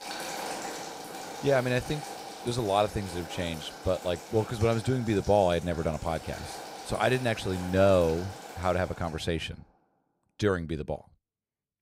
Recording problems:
household noises; noticeable; until 9 s; 10 dB below the speech

